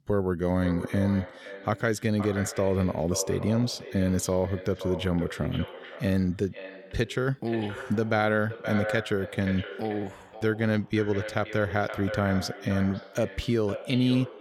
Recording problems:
echo of what is said; strong; throughout; 520 ms later, 10 dB below the speech

